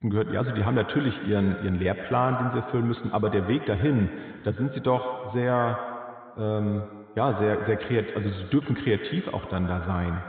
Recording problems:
echo of what is said; strong; throughout; 100 ms later, 9 dB below the speech
high frequencies cut off; severe; nothing above 4 kHz

